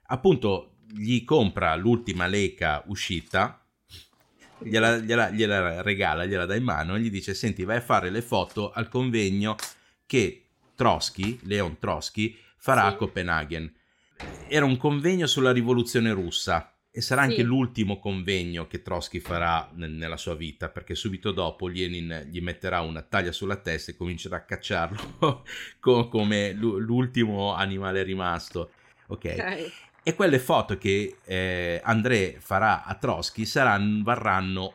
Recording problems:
household noises; faint; throughout; 25 dB below the speech

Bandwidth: 16.5 kHz